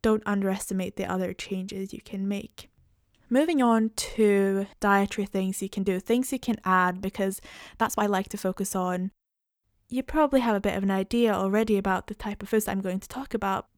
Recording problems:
uneven, jittery; strongly; from 1 to 13 s

